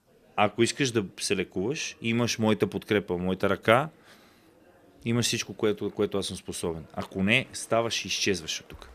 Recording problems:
murmuring crowd; faint; throughout; 30 dB below the speech

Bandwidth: 14.5 kHz